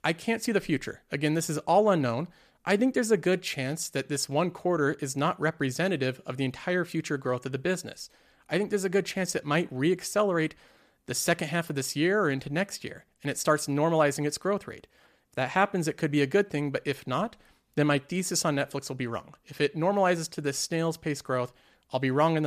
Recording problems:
abrupt cut into speech; at the end

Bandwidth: 14.5 kHz